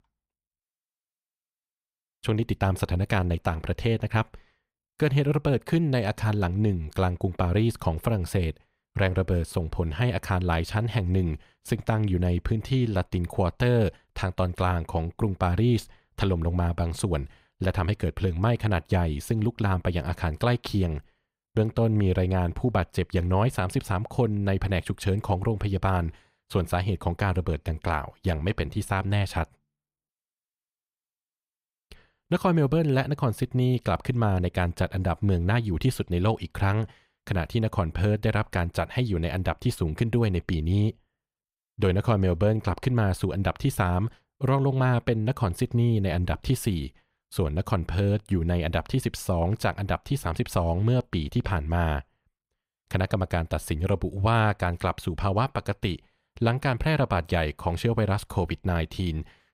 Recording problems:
none

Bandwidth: 15.5 kHz